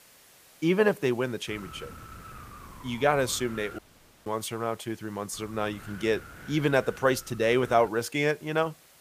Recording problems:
wind noise on the microphone; occasional gusts; from 1.5 to 4 s and from 5.5 to 8 s; 20 dB below the speech
hiss; faint; throughout; 25 dB below the speech
audio cutting out; at 4 s

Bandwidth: 15 kHz